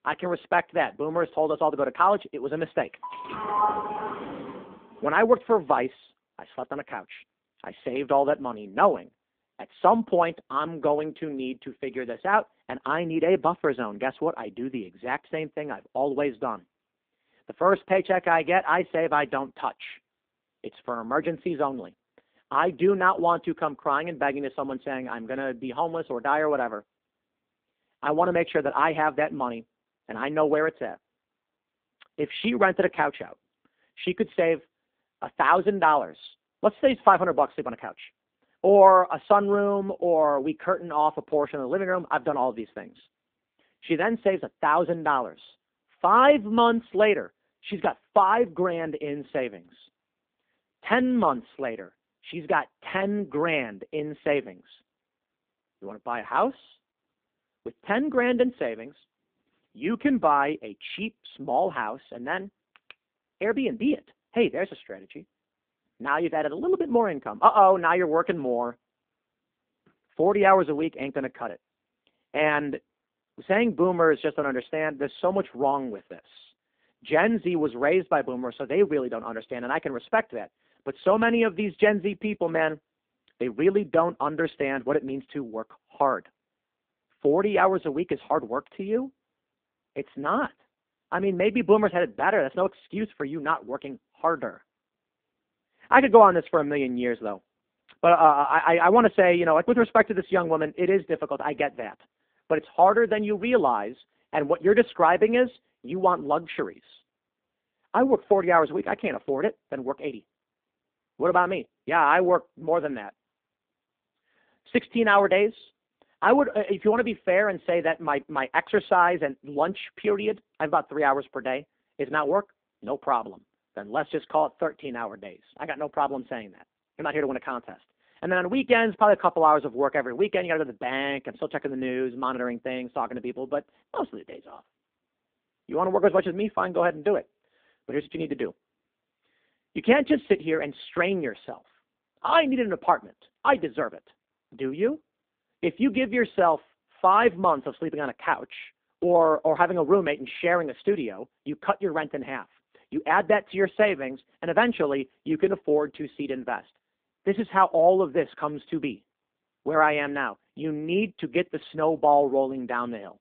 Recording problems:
phone-call audio; poor line
doorbell; loud; from 3 to 4.5 s; peak level with the speech

